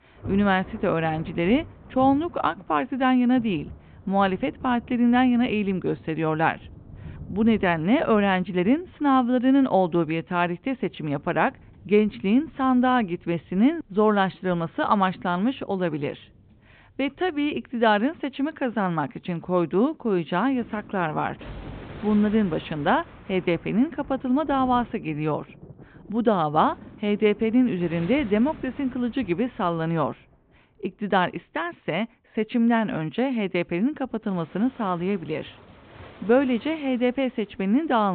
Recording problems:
high frequencies cut off; severe; nothing above 4 kHz
rain or running water; faint; throughout; 20 dB below the speech
abrupt cut into speech; at the end

